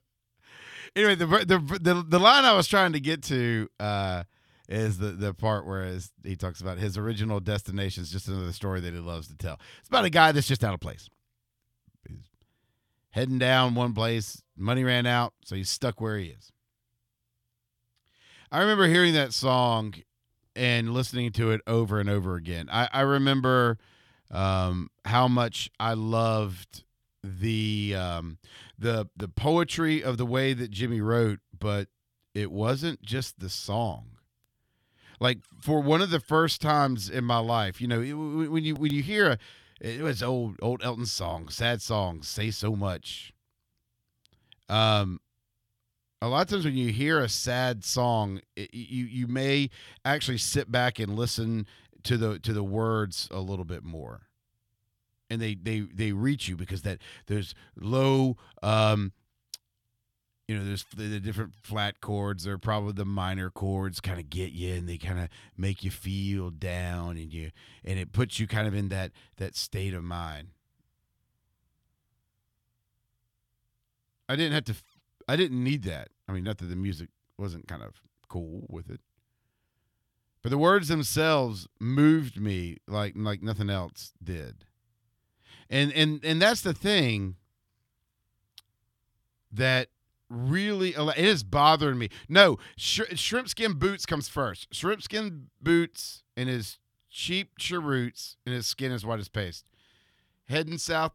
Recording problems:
none

